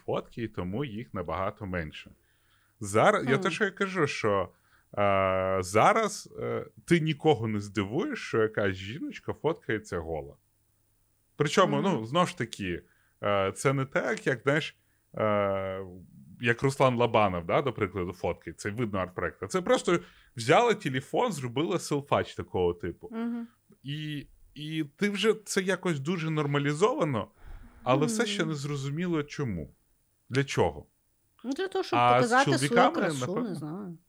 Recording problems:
none

